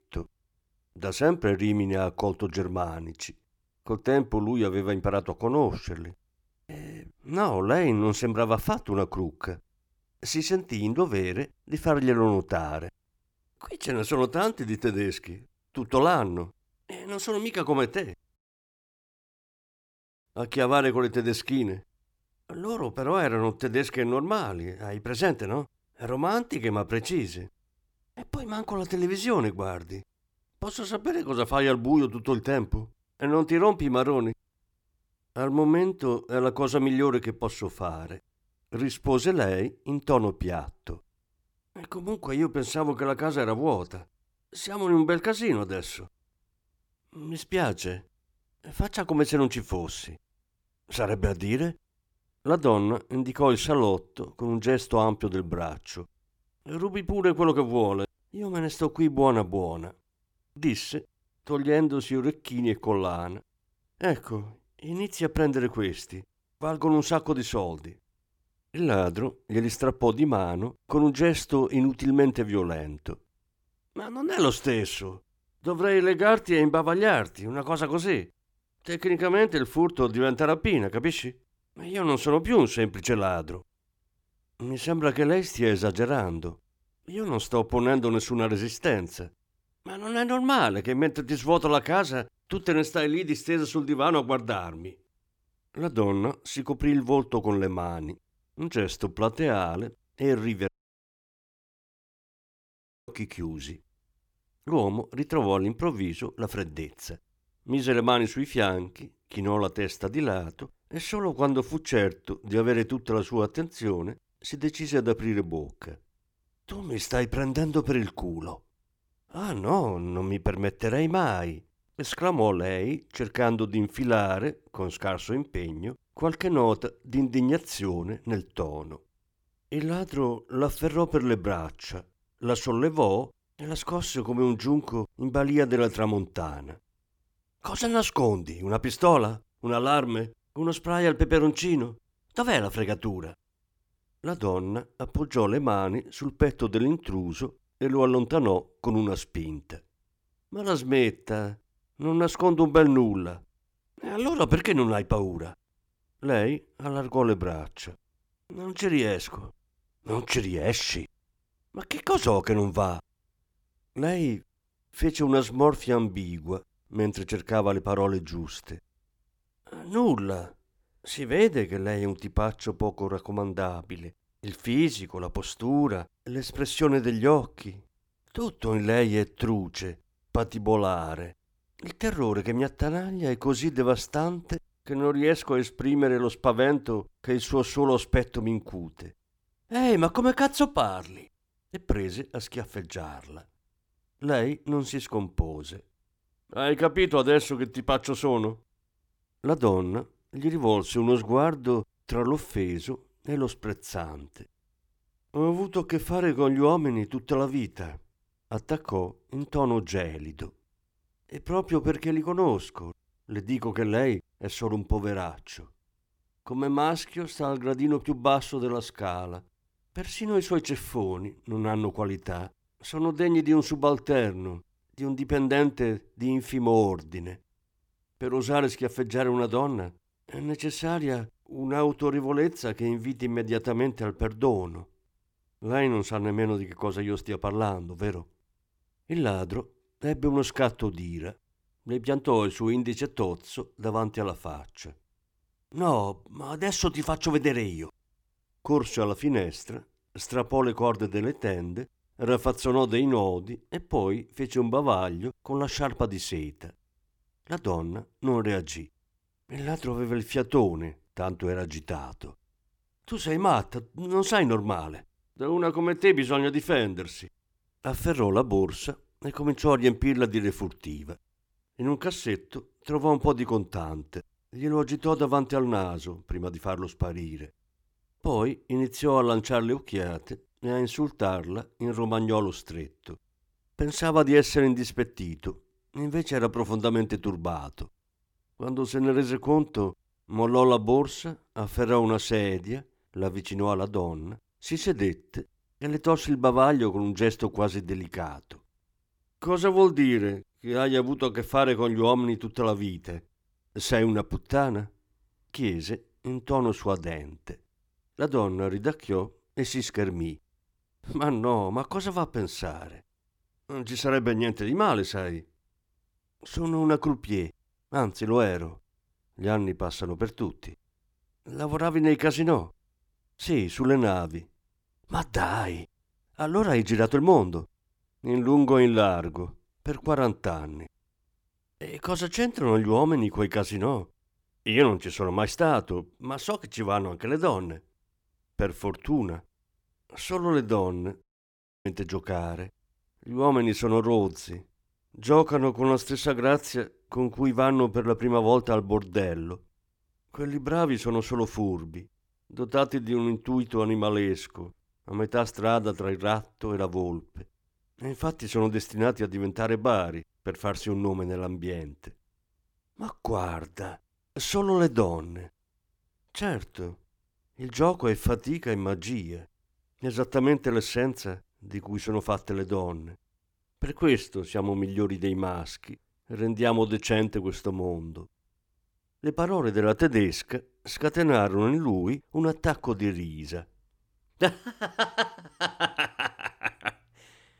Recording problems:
audio cutting out; at 18 s for 2 s, at 1:41 for 2.5 s and at 5:41 for 0.5 s

